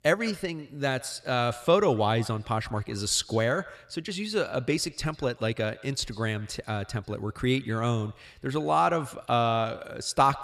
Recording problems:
echo of what is said; faint; throughout; 140 ms later, 20 dB below the speech

